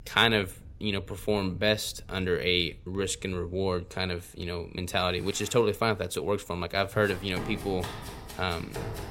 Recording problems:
household noises; noticeable; throughout; 10 dB below the speech
rain or running water; faint; throughout; 25 dB below the speech

